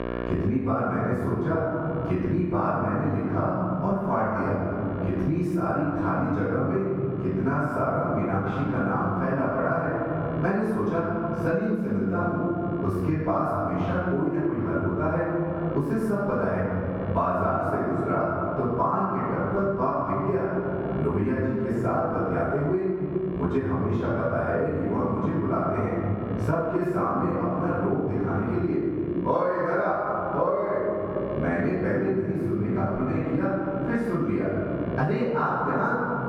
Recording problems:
room echo; strong; dies away in 1.8 s
off-mic speech; far
muffled; very; fading above 2.5 kHz
squashed, flat; somewhat
electrical hum; noticeable; throughout; 60 Hz, 20 dB below the speech

